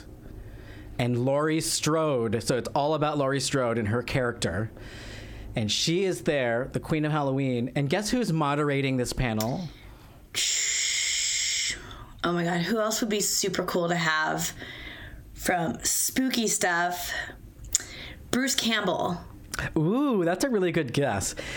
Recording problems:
squashed, flat; heavily

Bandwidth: 17 kHz